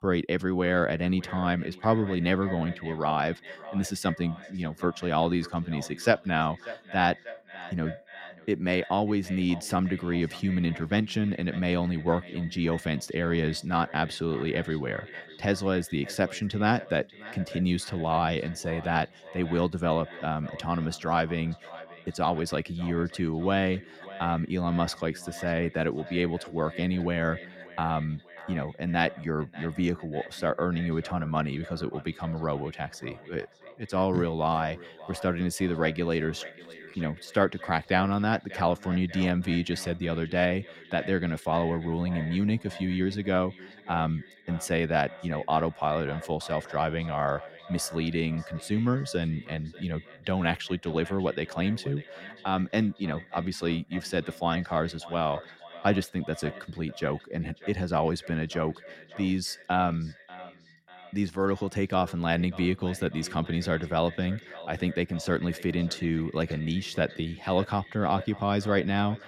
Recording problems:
echo of what is said; noticeable; throughout; 590 ms later, 15 dB below the speech

